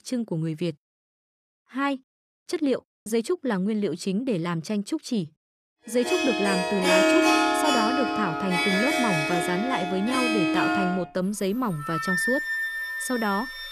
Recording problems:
background music; very loud; from 6 s on; 3 dB above the speech

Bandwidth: 14.5 kHz